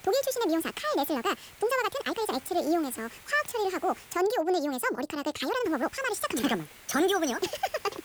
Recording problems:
wrong speed and pitch; too fast and too high; 1.7 times normal speed
hiss; faint; until 4 s and from 5.5 s on; 20 dB below the speech
uneven, jittery; strongly; from 1.5 to 6 s

